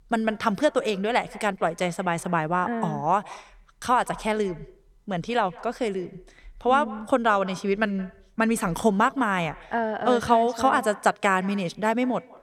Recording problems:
echo of what is said; faint; throughout; 170 ms later, 20 dB below the speech

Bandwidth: 18 kHz